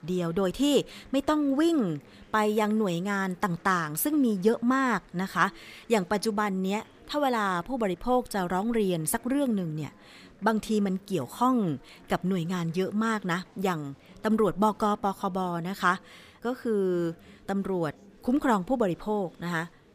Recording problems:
murmuring crowd; faint; throughout; 25 dB below the speech

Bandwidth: 15 kHz